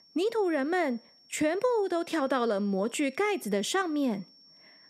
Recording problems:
high-pitched whine; faint; throughout; 5.5 kHz, 25 dB below the speech

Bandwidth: 14.5 kHz